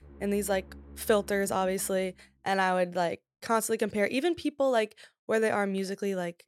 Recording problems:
background music; faint; until 2 s; 20 dB below the speech

